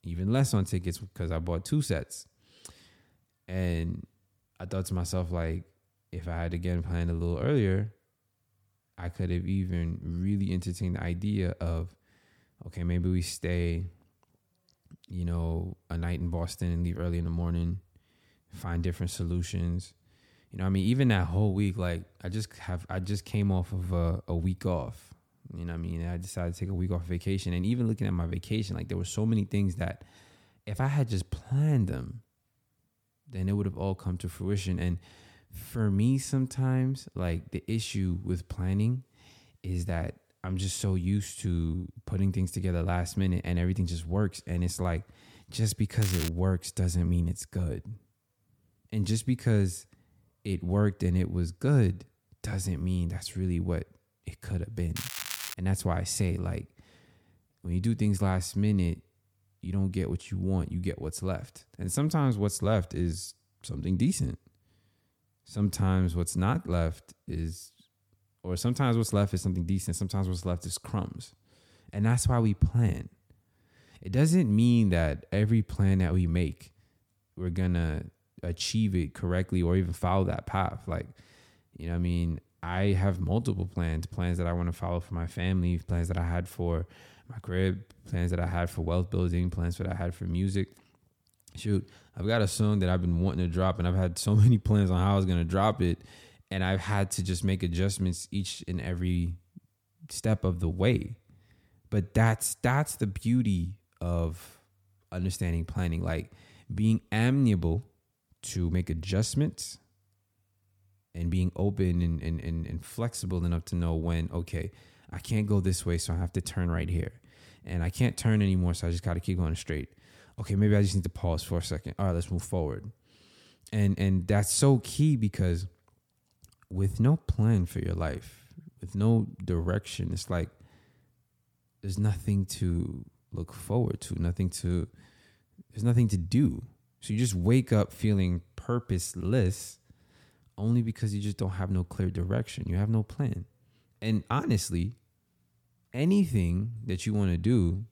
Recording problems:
crackling; loud; at 46 s and at 55 s; 7 dB below the speech

